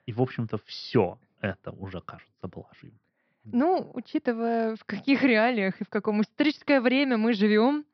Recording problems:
high frequencies cut off; noticeable; nothing above 5.5 kHz

